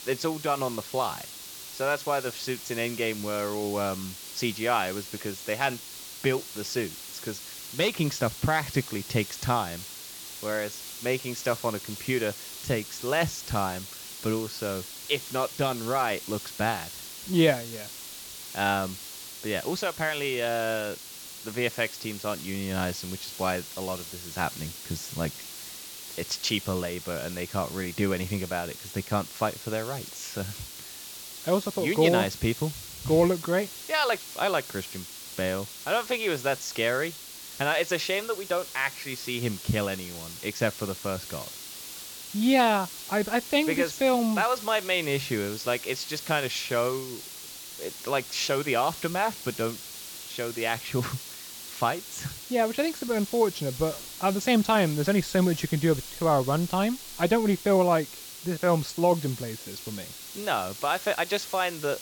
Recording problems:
high frequencies cut off; noticeable; nothing above 8 kHz
hiss; noticeable; throughout; 10 dB below the speech

